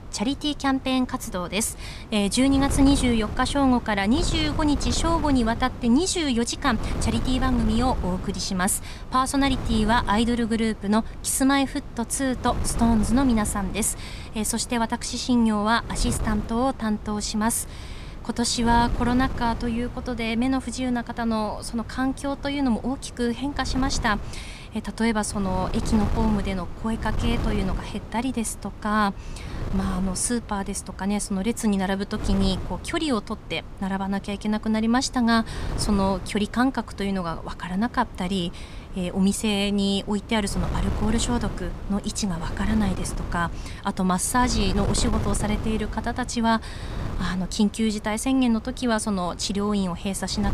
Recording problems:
wind noise on the microphone; occasional gusts; 15 dB below the speech

